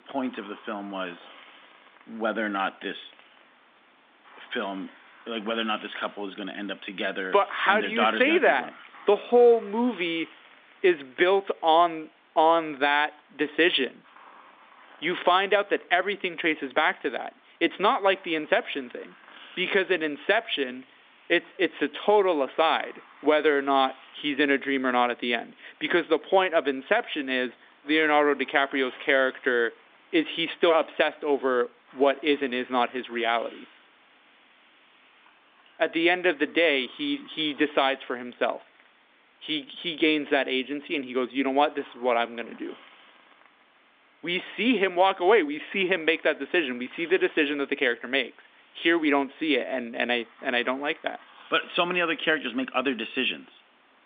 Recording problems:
phone-call audio
hiss; faint; throughout; 25 dB below the speech

